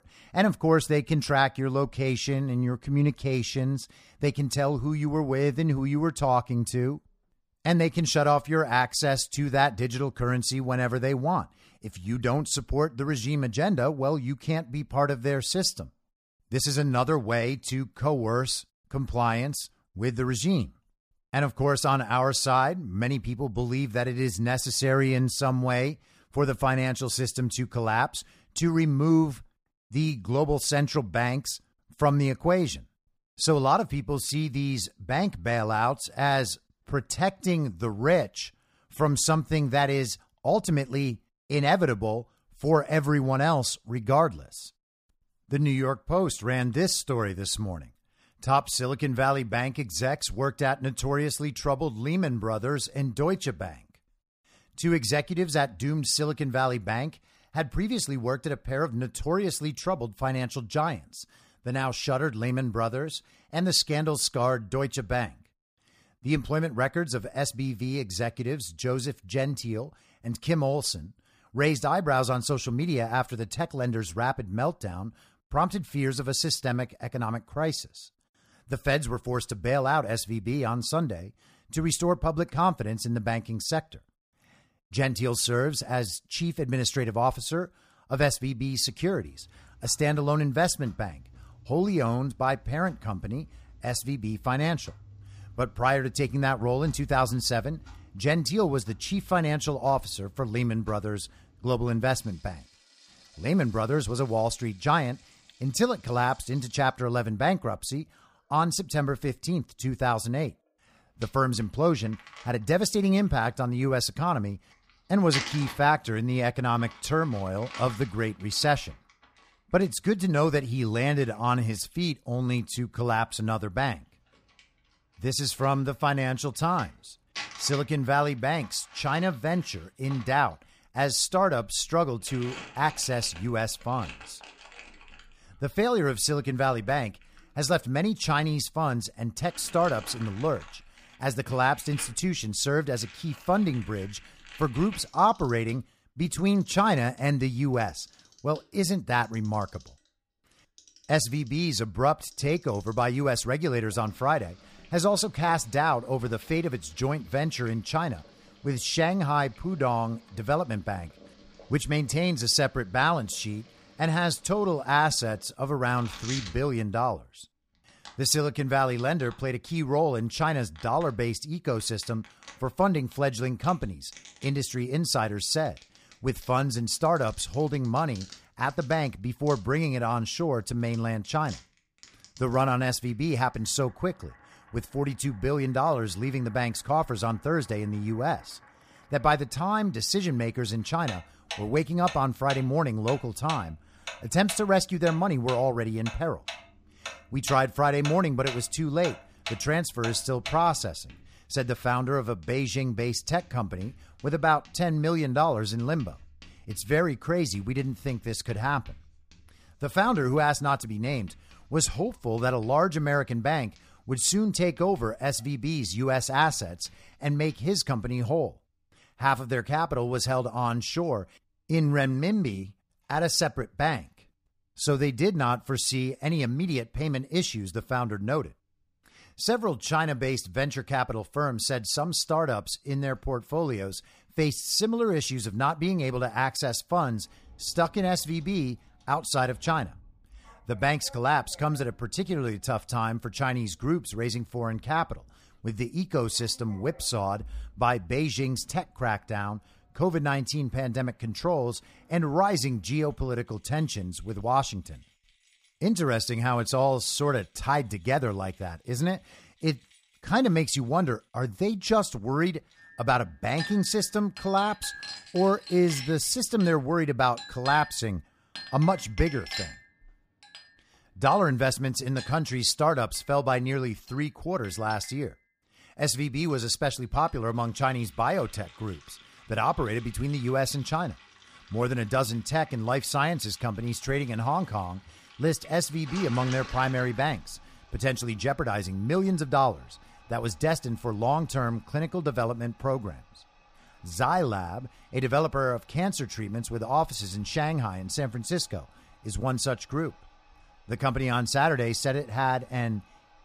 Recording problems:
household noises; noticeable; from 1:29 on; 20 dB below the speech

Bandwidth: 15 kHz